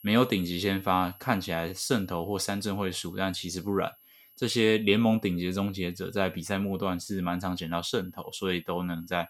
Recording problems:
high-pitched whine; faint; throughout; 11.5 kHz, 25 dB below the speech

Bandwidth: 17 kHz